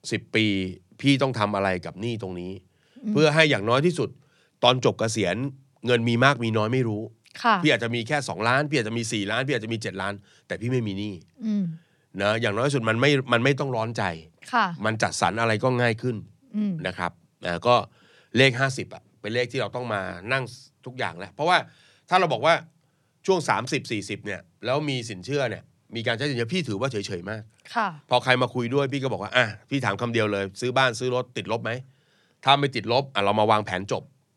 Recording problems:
none

